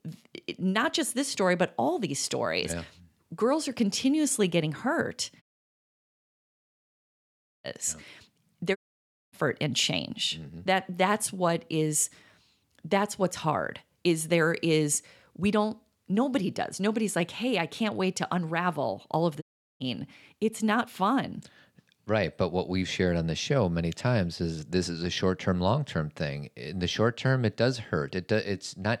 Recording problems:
audio cutting out; at 5.5 s for 2 s, at 9 s for 0.5 s and at 19 s

